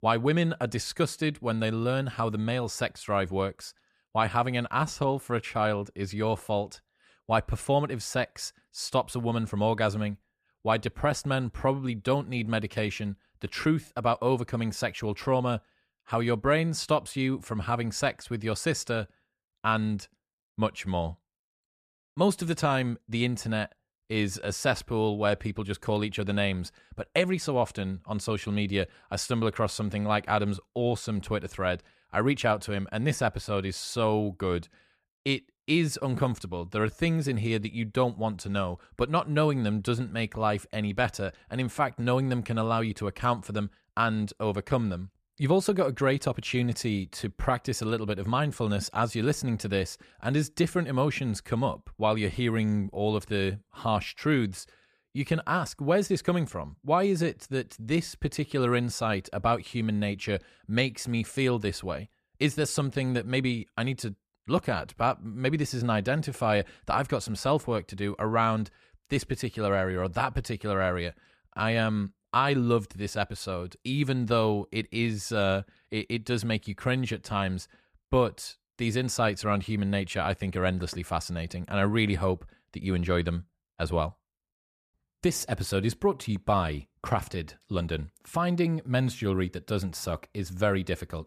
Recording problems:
none

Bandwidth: 14.5 kHz